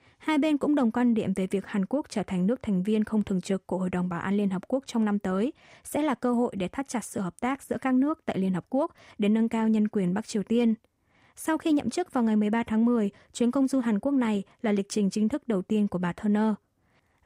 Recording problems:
none

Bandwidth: 15.5 kHz